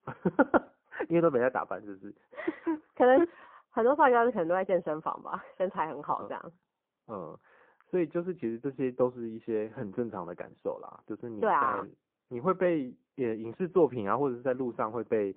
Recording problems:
phone-call audio; poor line
muffled; very; fading above 3.5 kHz

